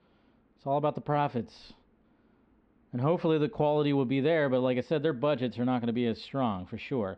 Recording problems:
muffled; slightly; fading above 3.5 kHz

